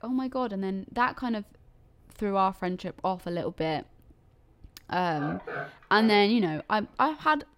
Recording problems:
animal sounds; noticeable; throughout; 15 dB below the speech

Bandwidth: 16 kHz